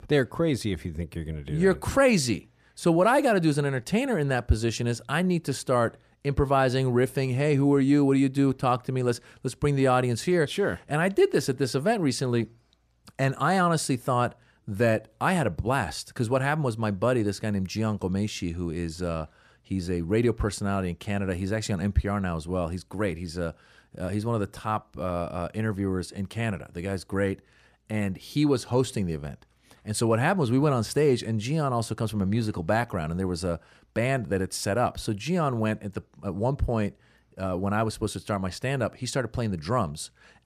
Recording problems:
none

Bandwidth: 14.5 kHz